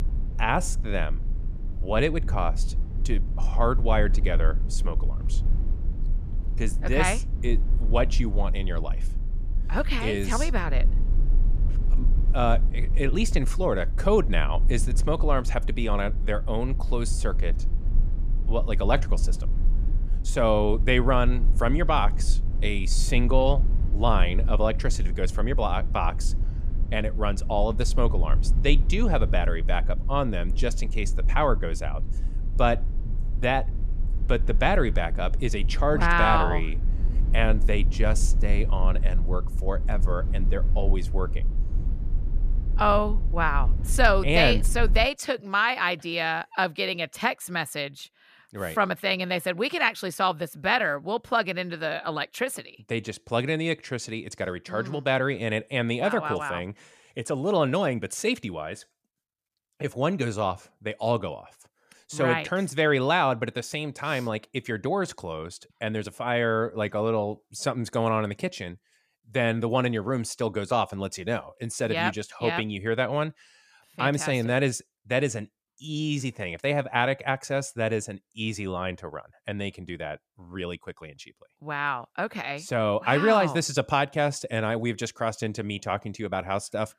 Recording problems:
low rumble; faint; until 45 s; 20 dB below the speech

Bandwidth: 14.5 kHz